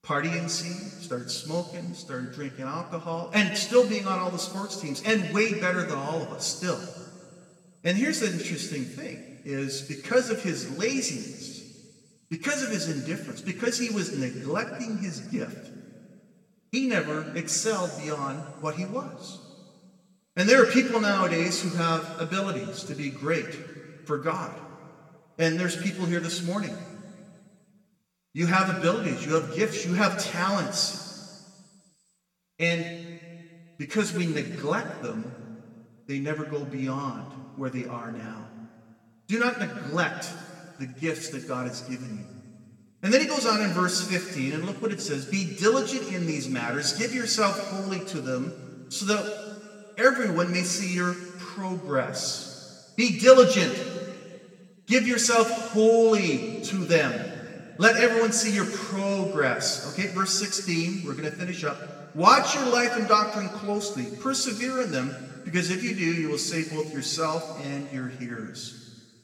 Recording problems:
room echo; slight; dies away in 1.9 s
off-mic speech; somewhat distant

